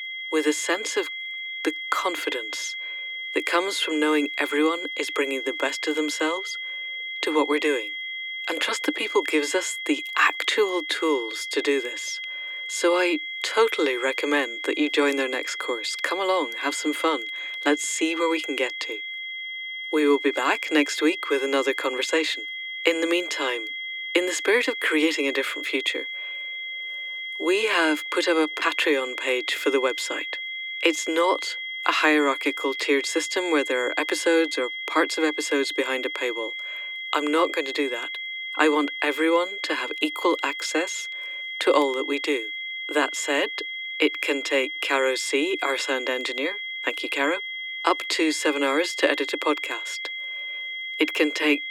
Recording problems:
thin; somewhat; fading below 300 Hz
high-pitched whine; loud; throughout; 2 kHz, 6 dB below the speech

